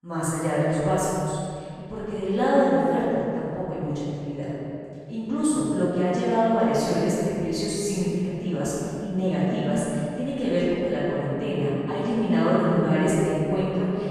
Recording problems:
room echo; strong; dies away in 2.3 s
off-mic speech; far

